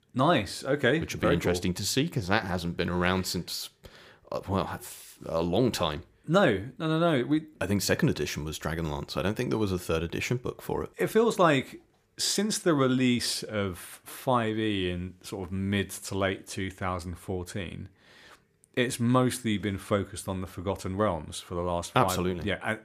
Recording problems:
none

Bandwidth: 15 kHz